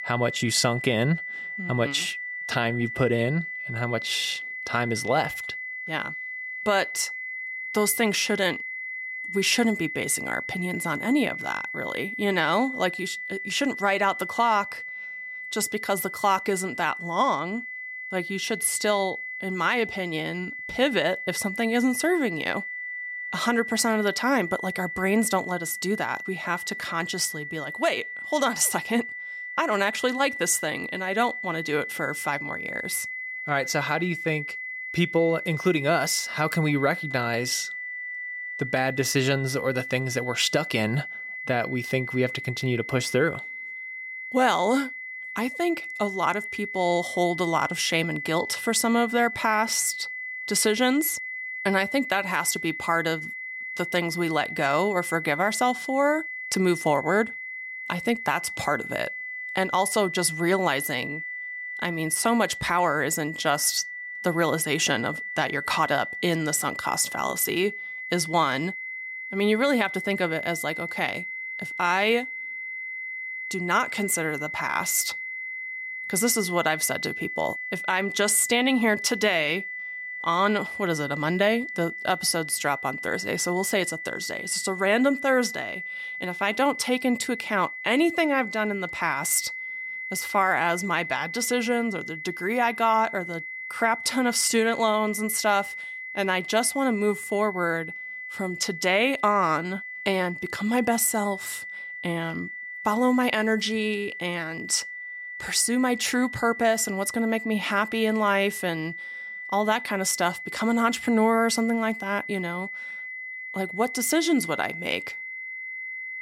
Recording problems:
high-pitched whine; loud; throughout; 2 kHz, 8 dB below the speech

